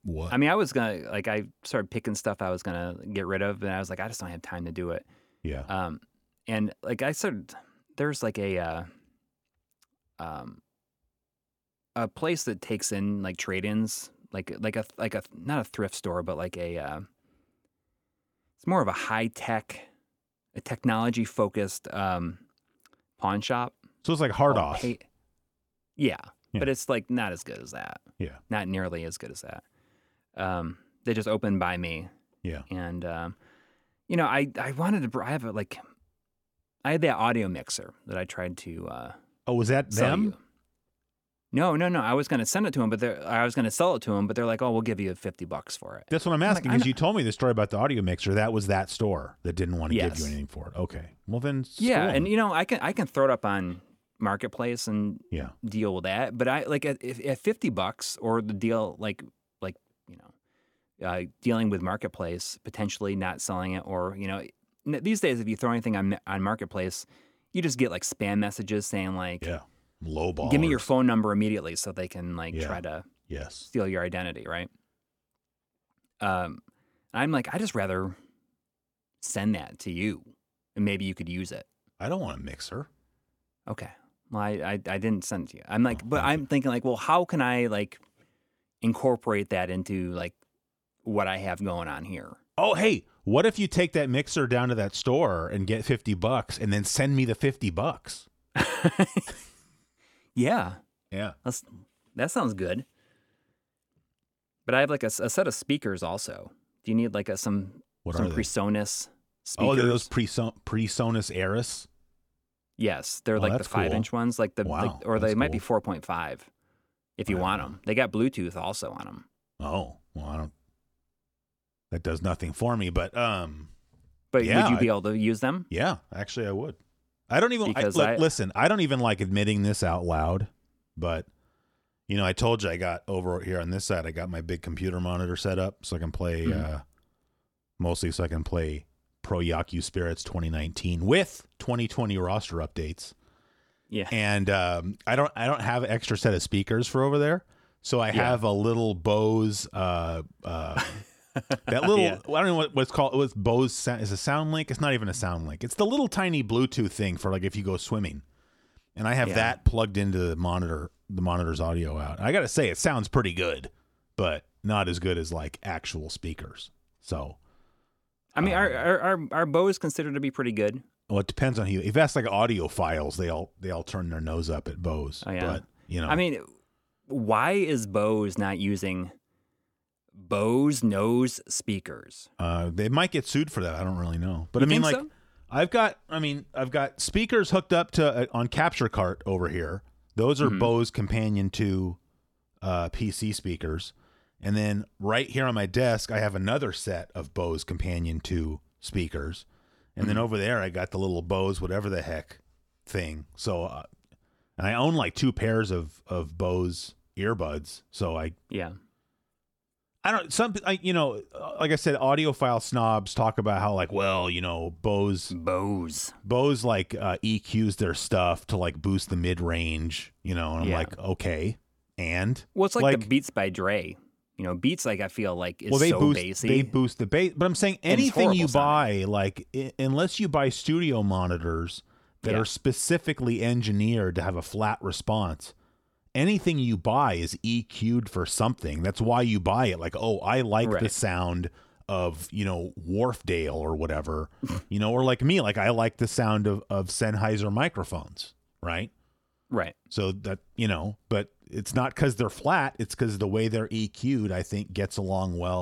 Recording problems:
abrupt cut into speech; at the end

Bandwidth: 17.5 kHz